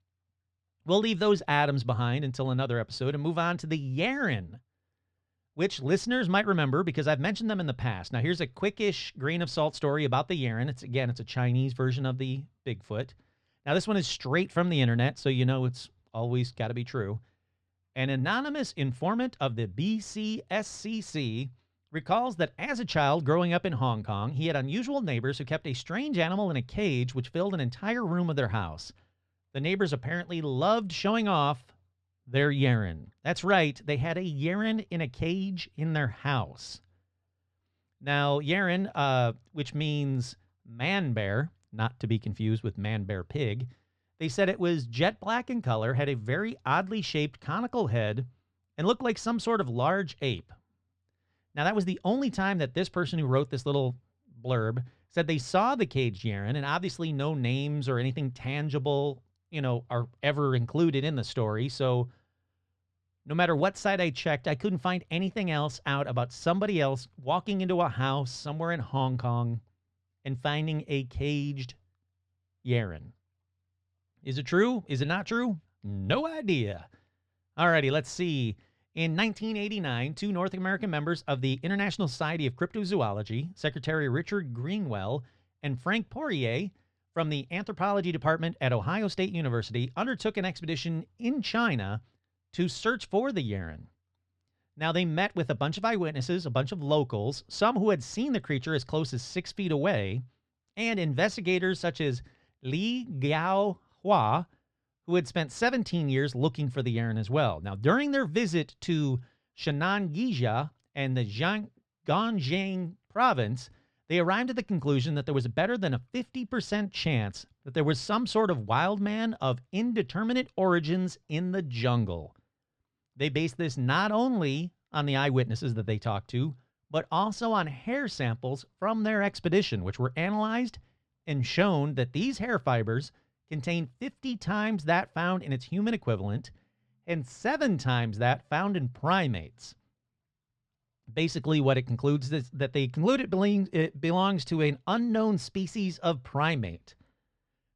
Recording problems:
muffled; slightly; fading above 3.5 kHz

